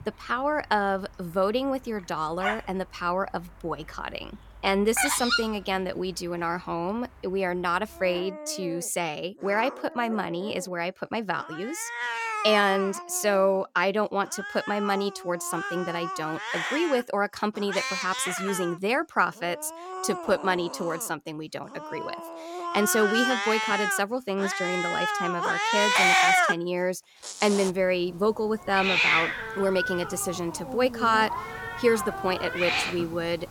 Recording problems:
animal sounds; loud; throughout; 1 dB below the speech

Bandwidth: 17 kHz